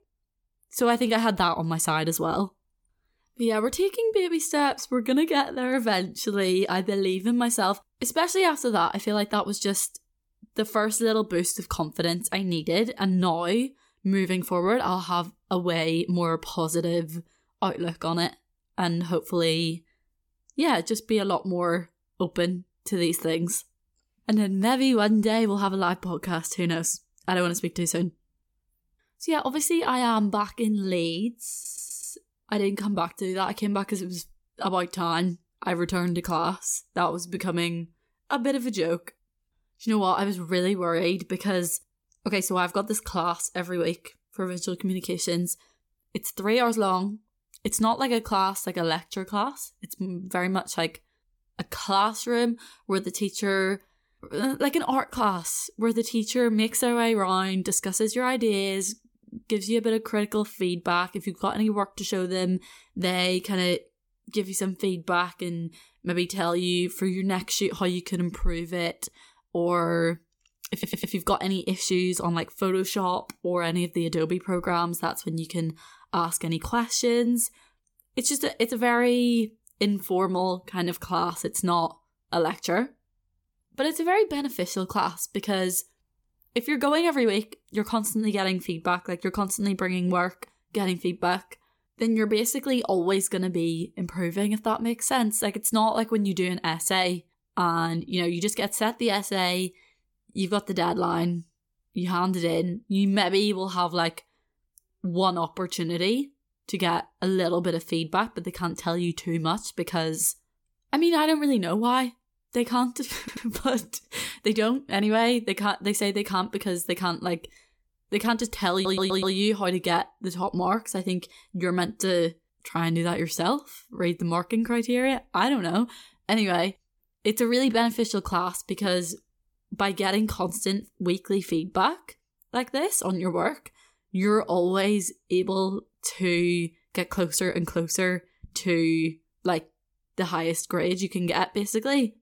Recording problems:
audio stuttering; 4 times, first at 32 s

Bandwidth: 18 kHz